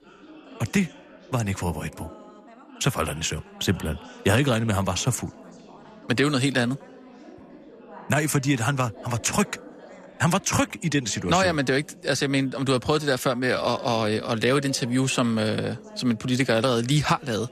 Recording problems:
background chatter; faint; throughout; 3 voices, 20 dB below the speech

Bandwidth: 14.5 kHz